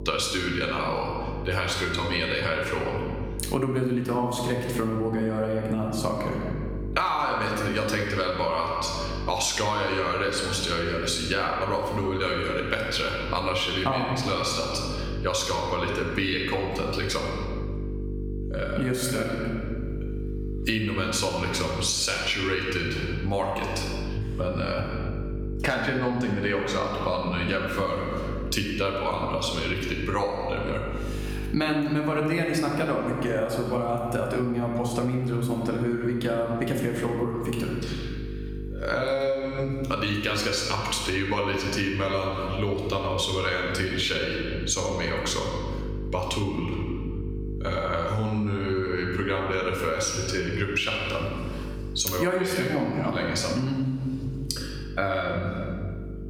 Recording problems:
room echo; noticeable; dies away in 1.1 s
off-mic speech; somewhat distant
squashed, flat; somewhat
electrical hum; noticeable; throughout; 50 Hz, 20 dB below the speech

